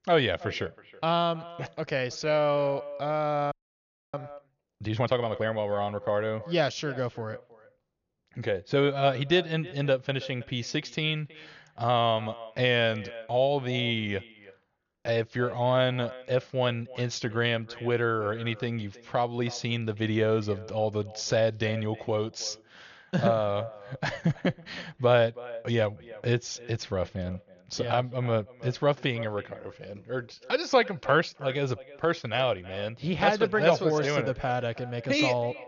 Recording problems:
high frequencies cut off; noticeable; nothing above 7 kHz
echo of what is said; faint; throughout; 320 ms later, 20 dB below the speech
audio freezing; at 3.5 s for 0.5 s

